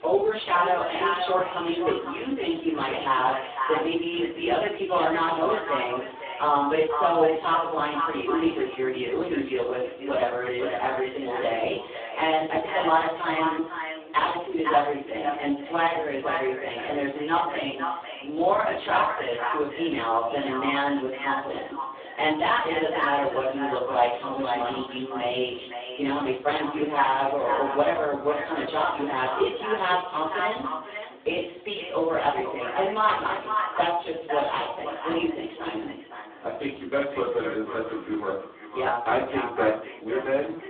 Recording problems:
phone-call audio; poor line; nothing above 3.5 kHz
echo of what is said; strong; throughout; 510 ms later, 7 dB below the speech
off-mic speech; far
room echo; noticeable; dies away in 0.5 s
murmuring crowd; faint; throughout; 25 dB below the speech

